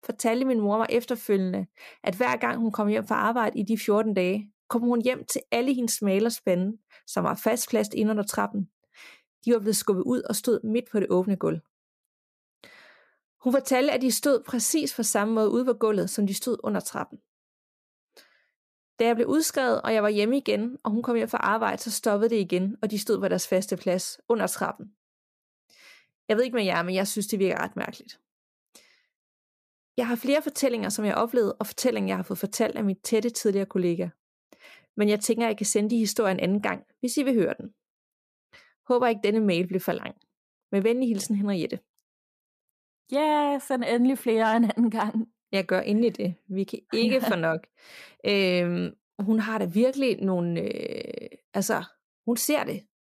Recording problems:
none

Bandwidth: 14.5 kHz